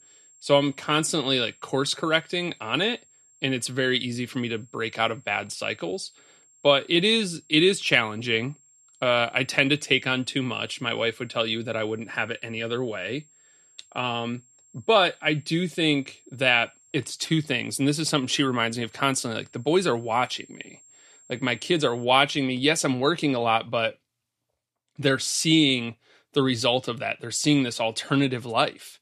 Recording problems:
high-pitched whine; faint; until 22 s; 7.5 kHz, 30 dB below the speech

